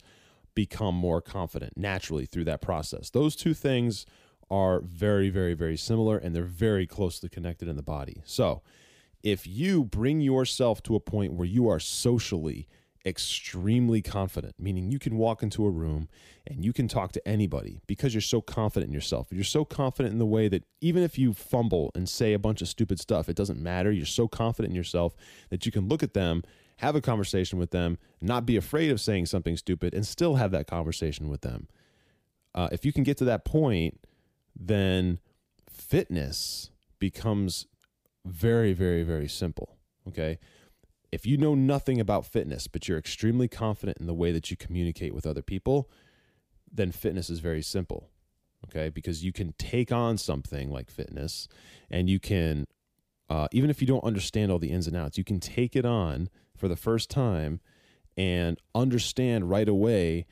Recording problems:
none

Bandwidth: 15 kHz